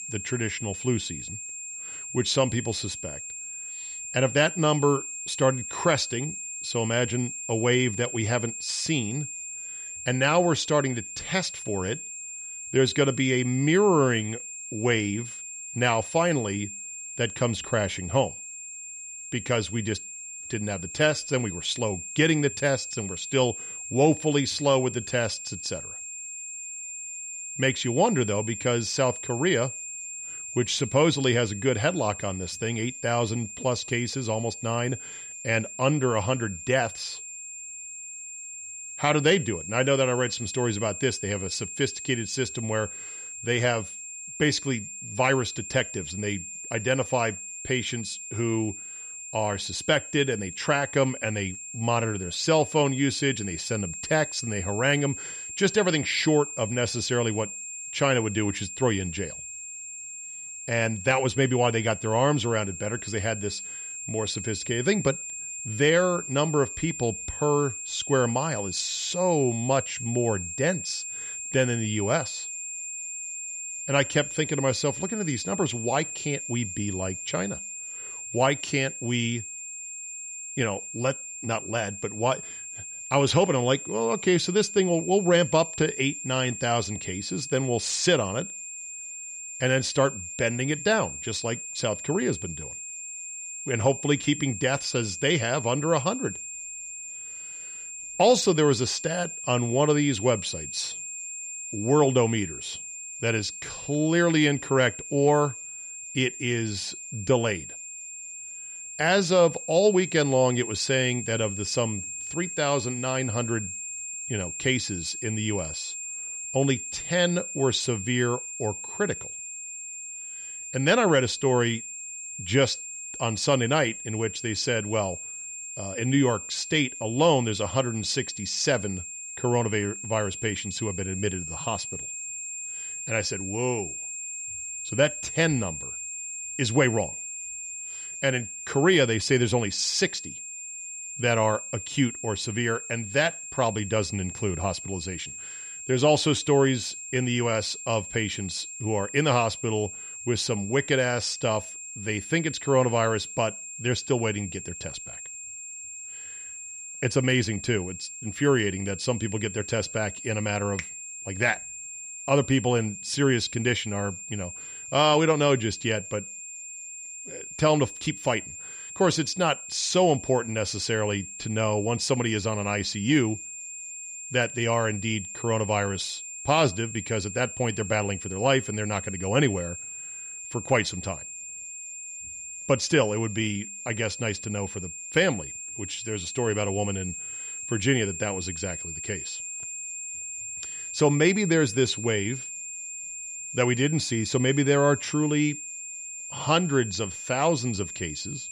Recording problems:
high-pitched whine; loud; throughout; 7.5 kHz, 9 dB below the speech

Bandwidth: 15 kHz